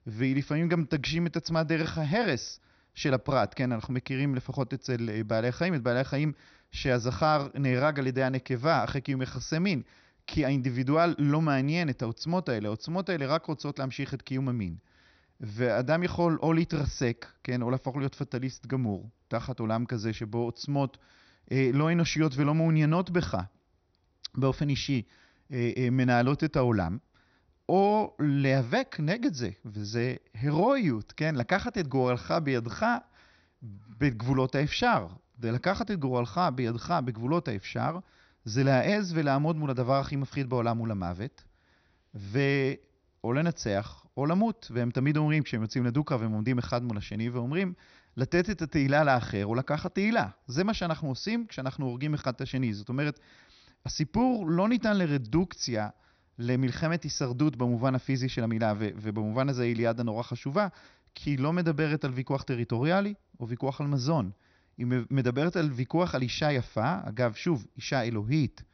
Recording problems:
high frequencies cut off; noticeable; nothing above 6 kHz

